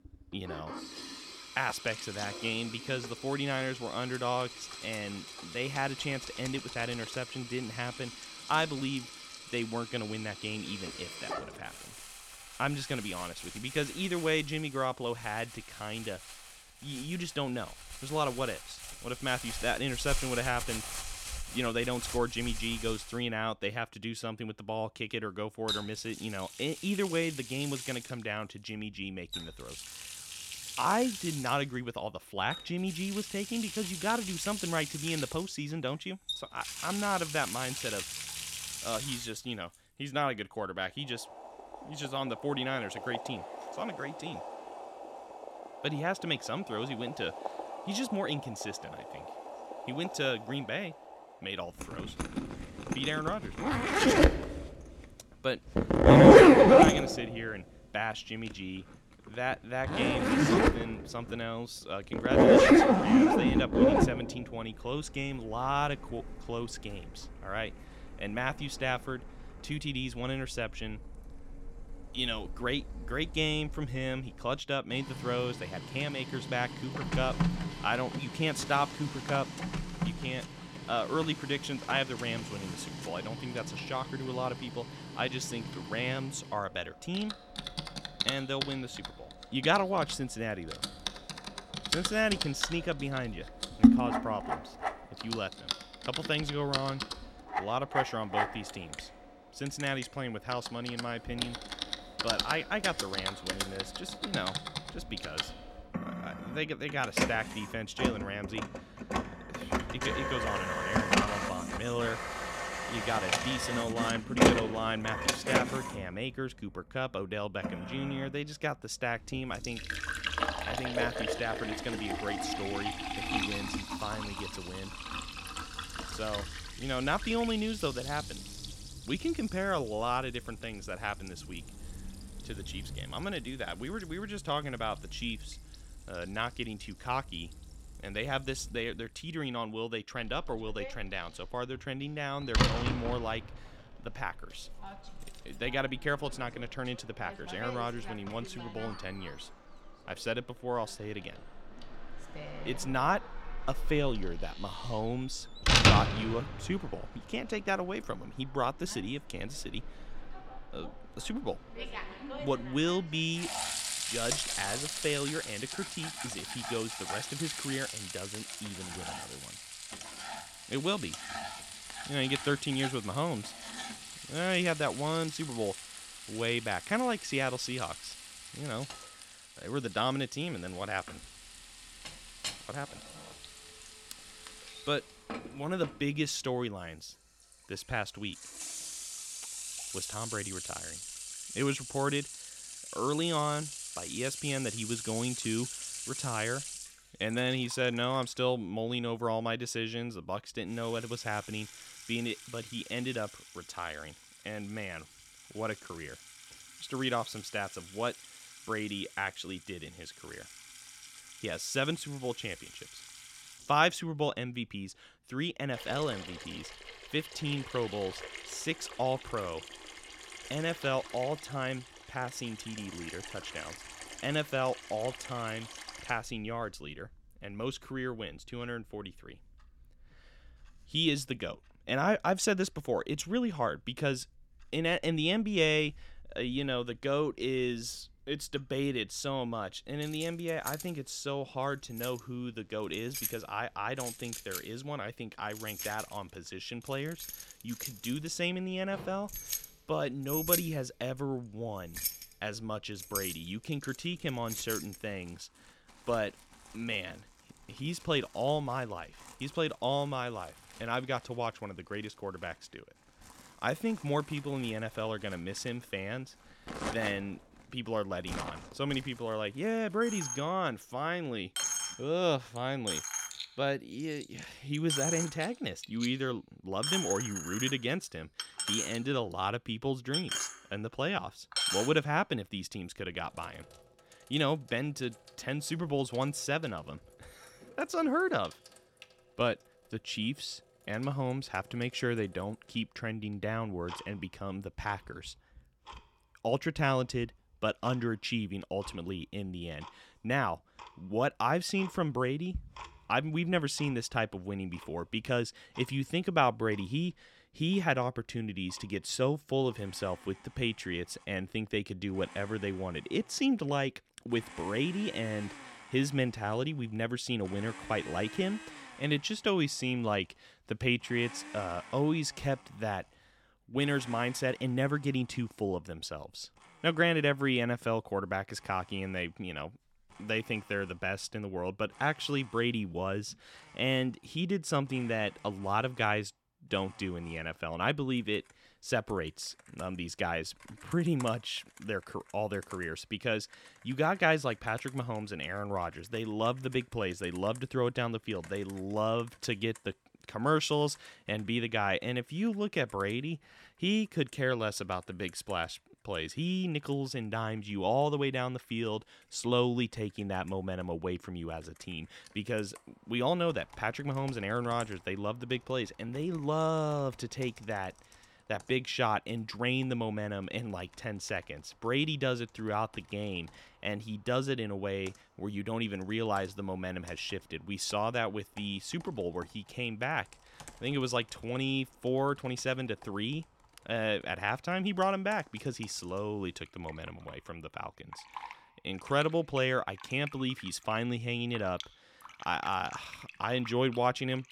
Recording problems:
household noises; very loud; throughout; 1 dB above the speech

